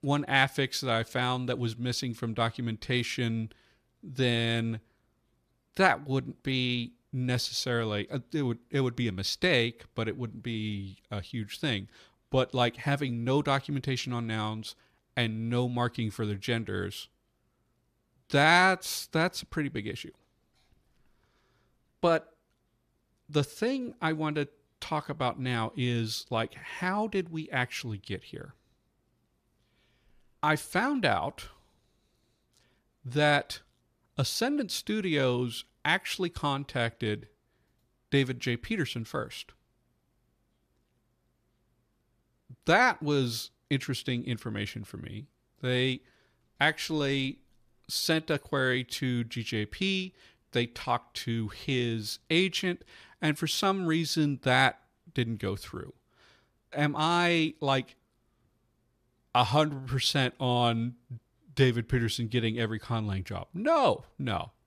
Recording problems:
none

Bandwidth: 14.5 kHz